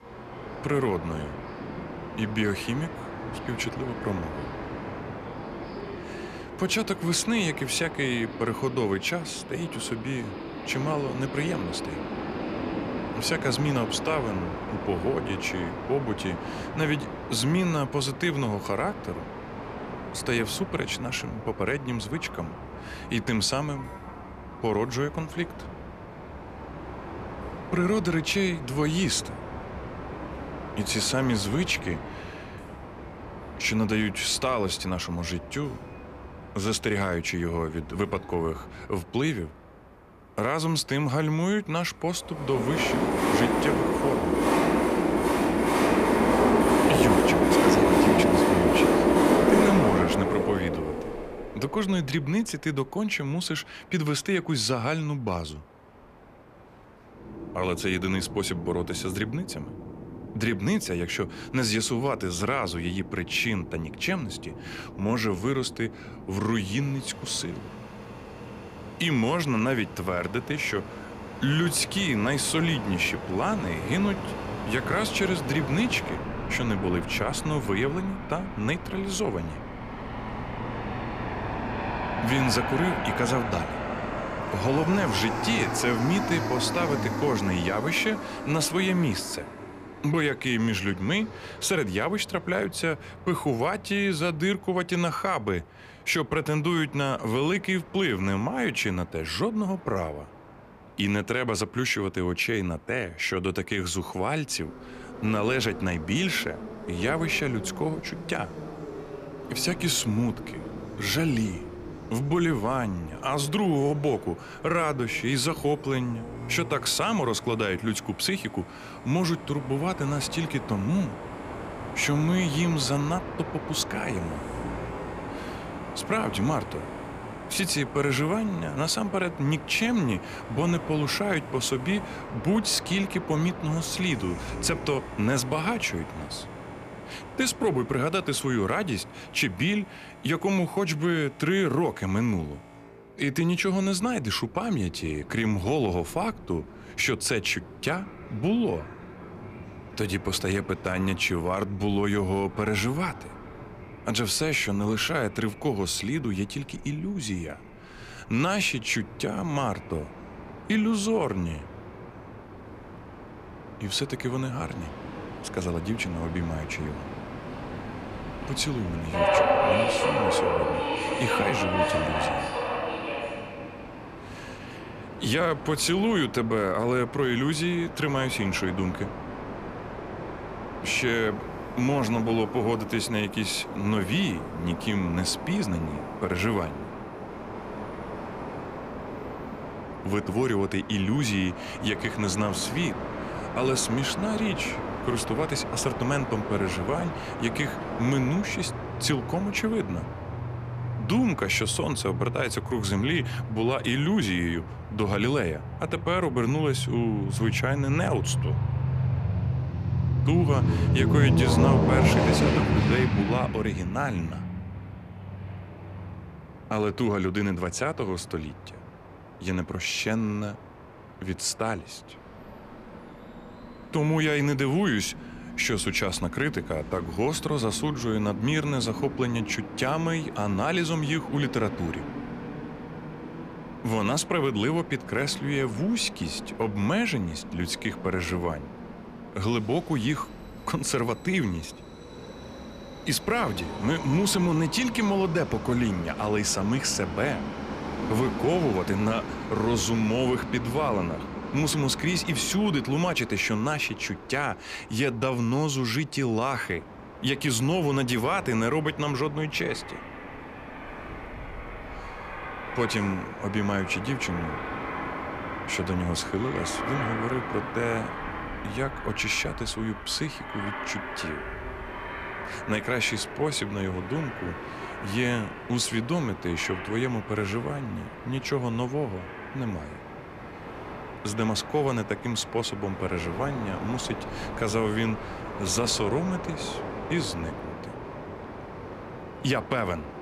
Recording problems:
train or aircraft noise; loud; throughout; 5 dB below the speech

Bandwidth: 14.5 kHz